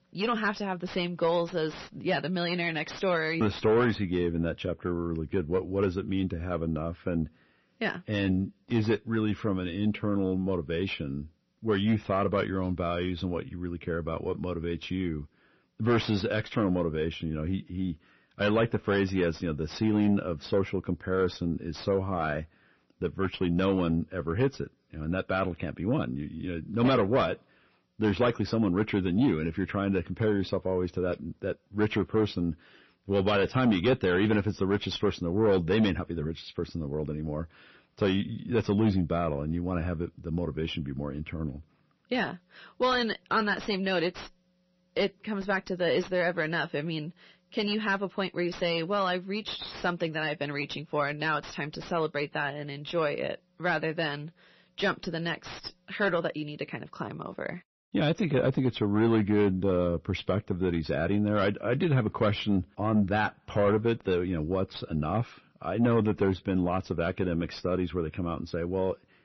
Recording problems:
distortion; slight; 10 dB below the speech
garbled, watery; slightly; nothing above 6 kHz

